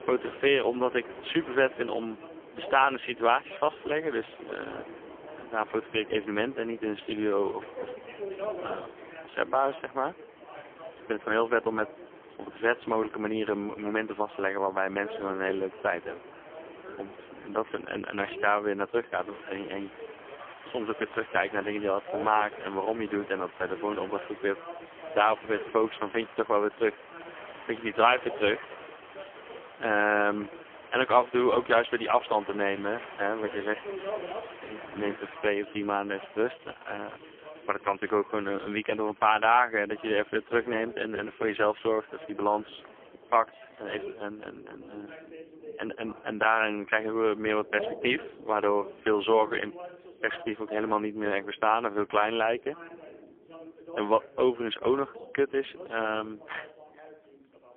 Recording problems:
phone-call audio; poor line; nothing above 3.5 kHz
rain or running water; noticeable; throughout; 20 dB below the speech
voice in the background; noticeable; throughout; 15 dB below the speech

